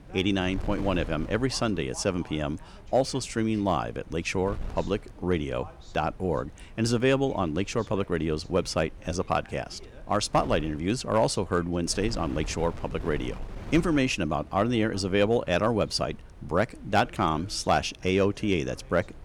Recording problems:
wind noise on the microphone; occasional gusts; 25 dB below the speech
voice in the background; faint; throughout; 25 dB below the speech

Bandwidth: 18 kHz